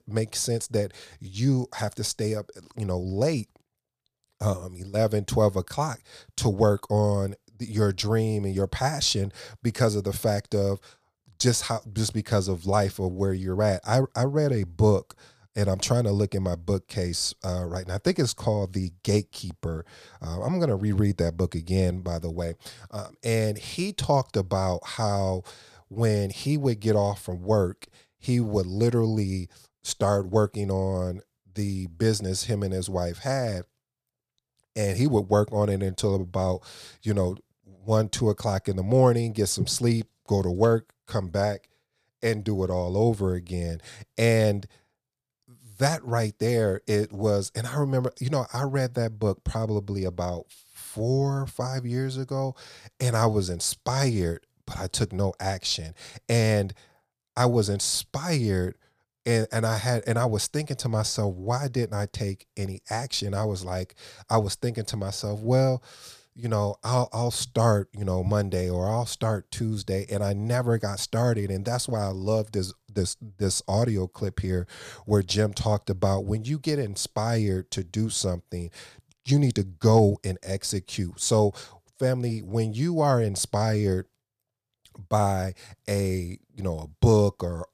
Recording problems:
none

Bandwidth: 15 kHz